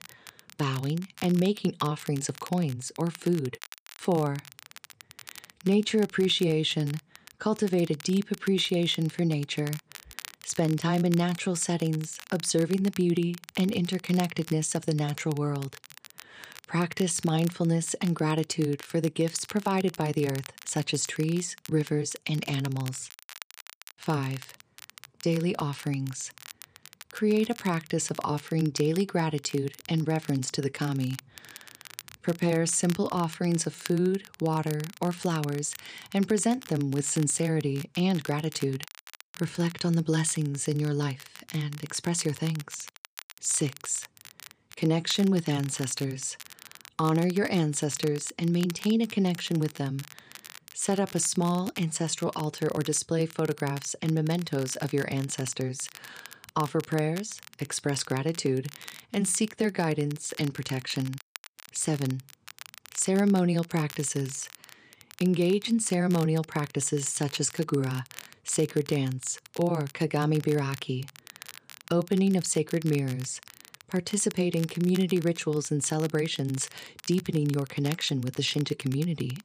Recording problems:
crackle, like an old record; noticeable; 20 dB below the speech

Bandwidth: 15 kHz